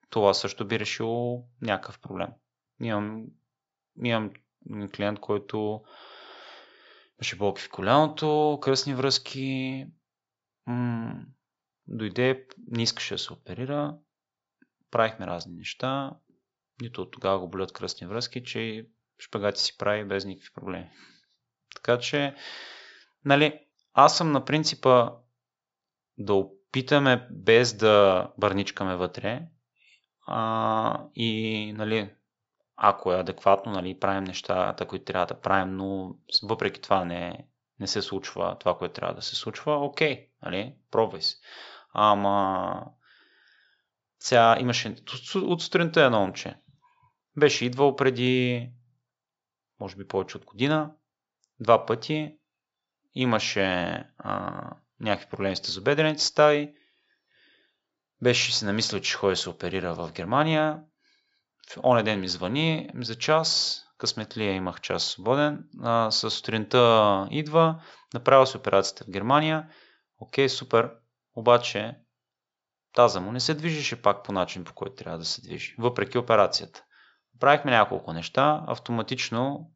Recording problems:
high frequencies cut off; noticeable; nothing above 8 kHz

